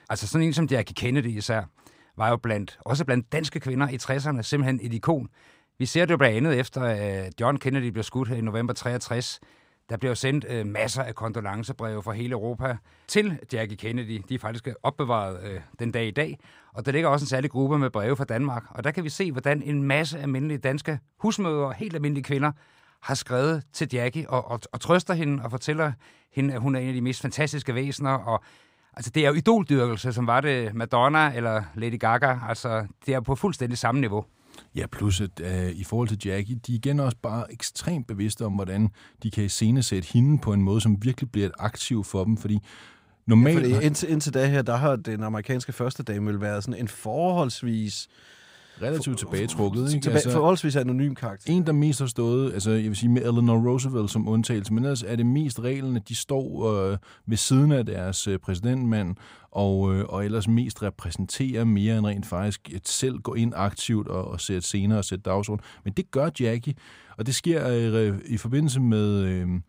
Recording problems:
none

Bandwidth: 15.5 kHz